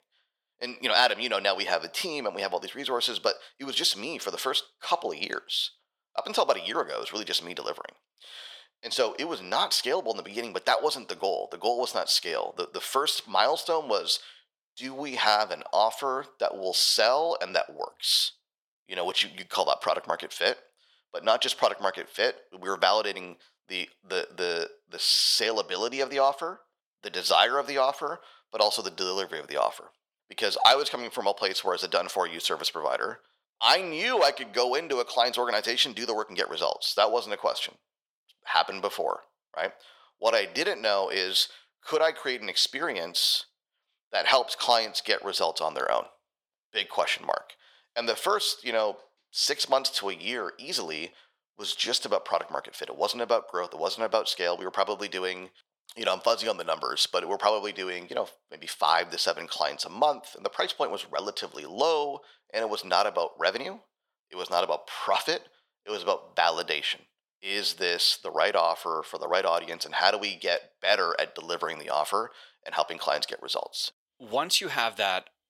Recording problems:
thin; very; fading below 650 Hz

